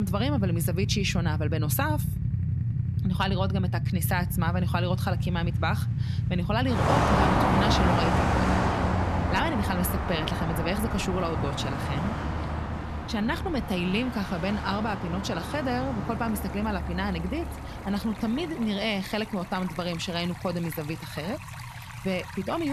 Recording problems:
traffic noise; very loud; throughout; 1 dB above the speech
rain or running water; noticeable; throughout; 15 dB below the speech
abrupt cut into speech; at the start and the end

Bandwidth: 13.5 kHz